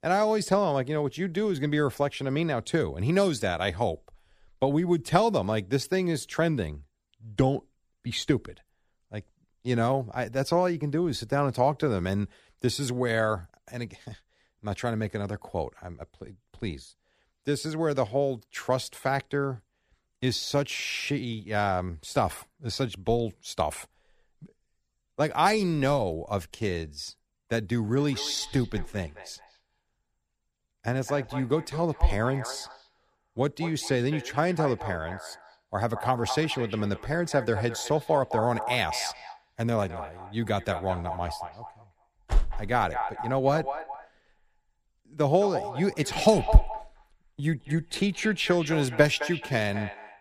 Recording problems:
echo of what is said; strong; from 28 s on; 210 ms later, 10 dB below the speech

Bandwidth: 14.5 kHz